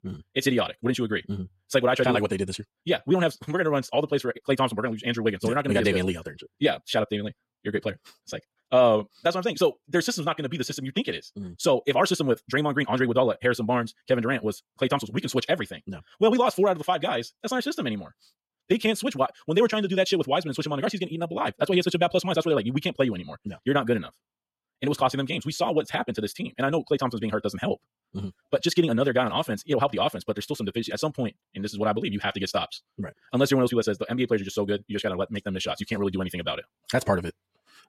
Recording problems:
wrong speed, natural pitch; too fast; 1.7 times normal speed

